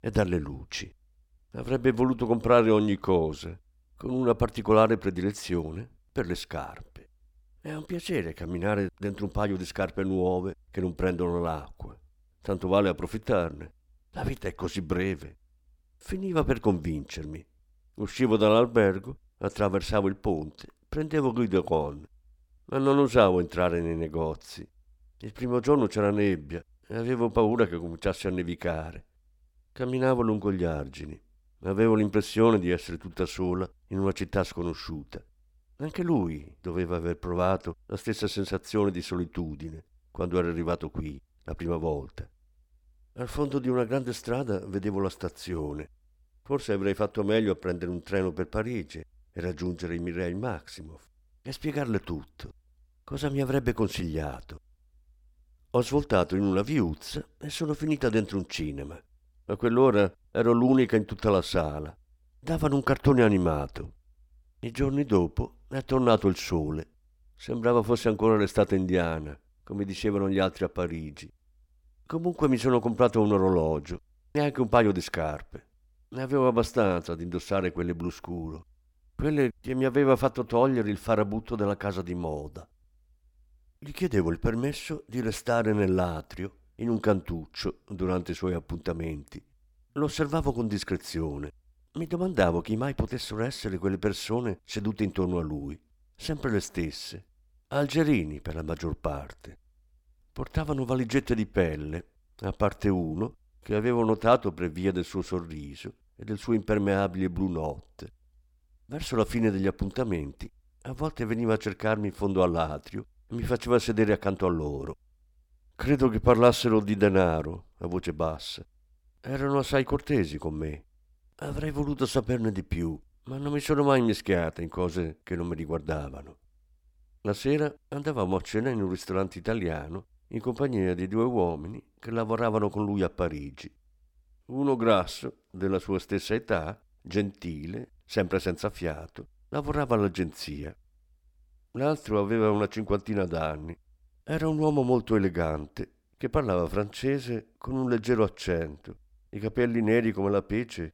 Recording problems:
none

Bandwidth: 17.5 kHz